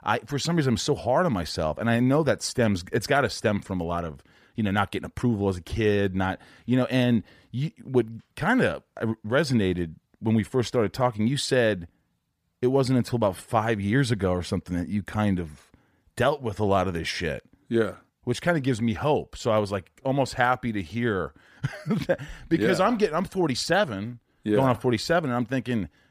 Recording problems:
none

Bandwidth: 15 kHz